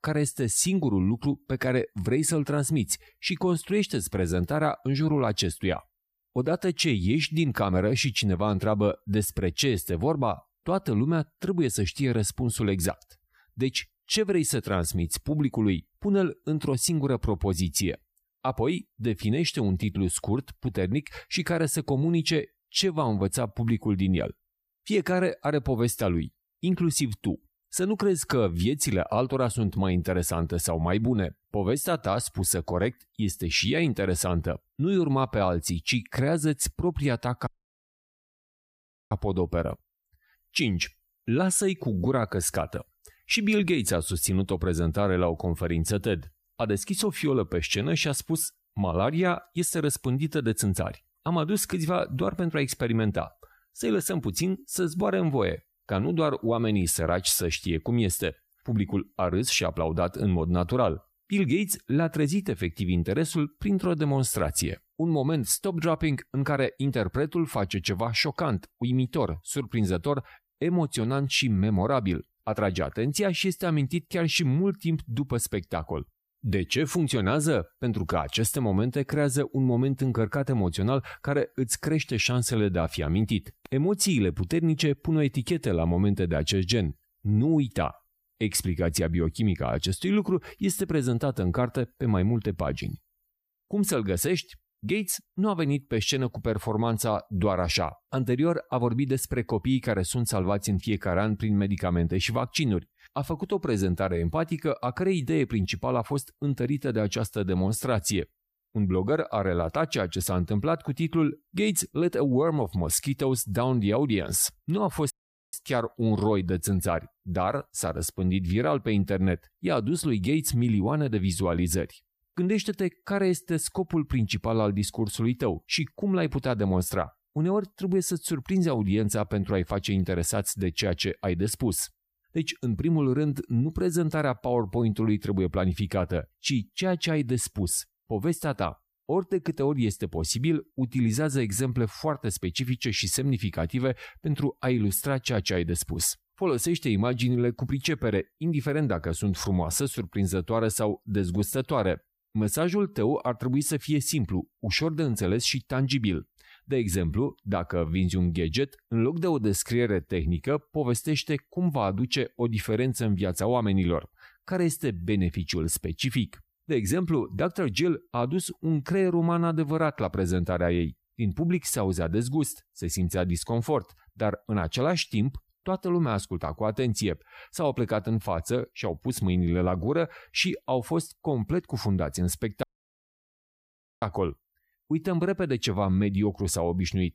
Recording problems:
audio cutting out; at 37 s for 1.5 s, at 1:55 and at 3:03 for 1.5 s

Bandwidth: 15 kHz